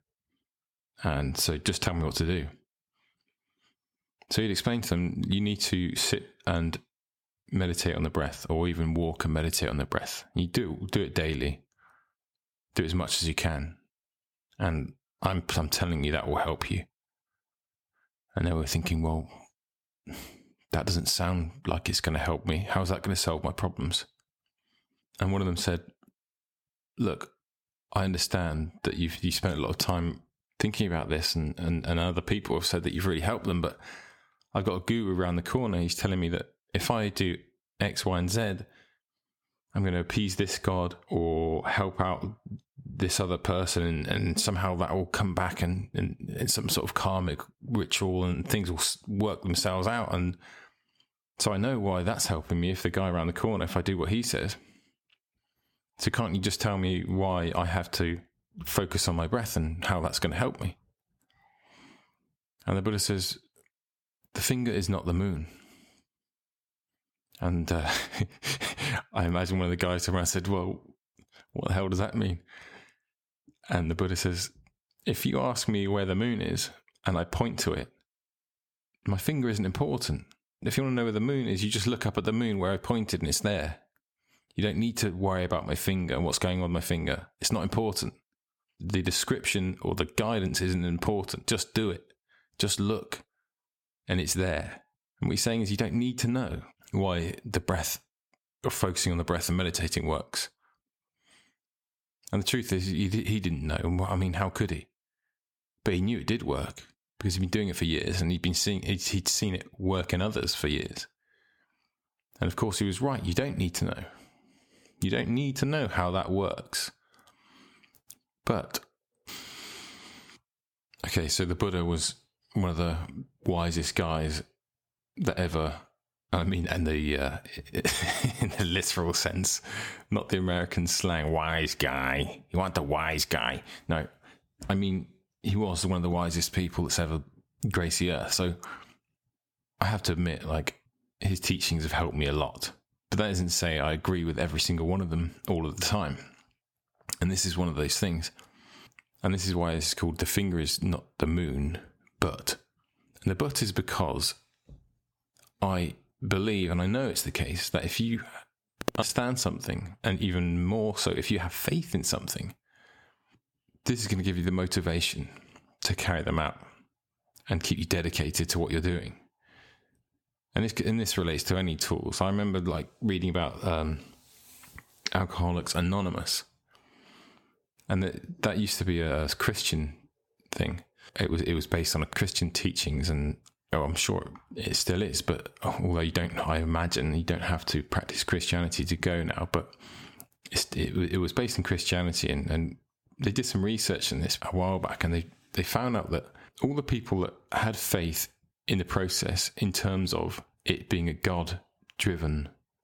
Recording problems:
squashed, flat; somewhat

